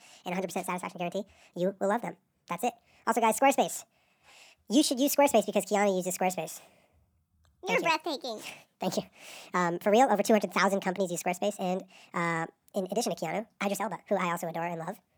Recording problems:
wrong speed and pitch; too fast and too high; 1.5 times normal speed

